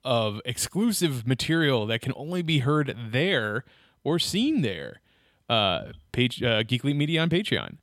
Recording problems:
none

